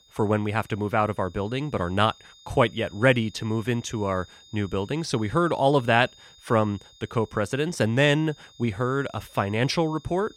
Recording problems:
high-pitched whine; faint; throughout; 3.5 kHz, 25 dB below the speech

